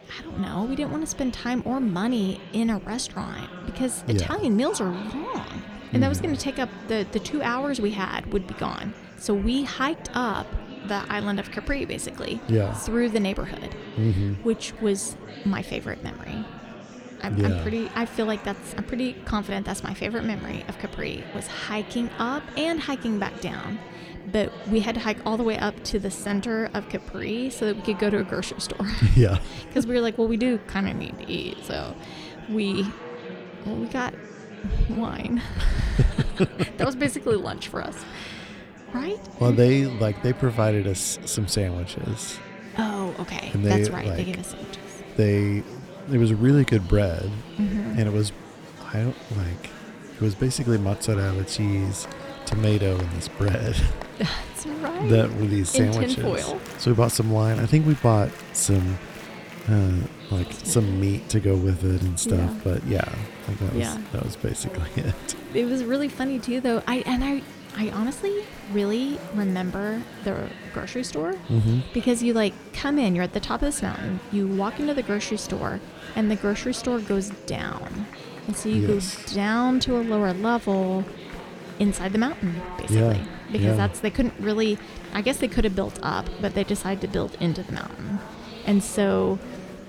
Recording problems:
murmuring crowd; noticeable; throughout; 15 dB below the speech

